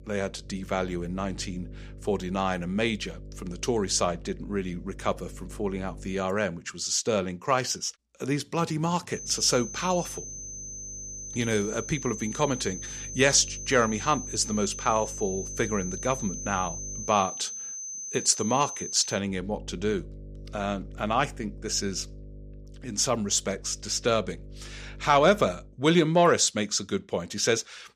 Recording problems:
high-pitched whine; loud; from 9 to 19 s; 6 kHz, 8 dB below the speech
electrical hum; faint; until 6 s, from 9 to 17 s and from 19 to 26 s; 50 Hz, 30 dB below the speech

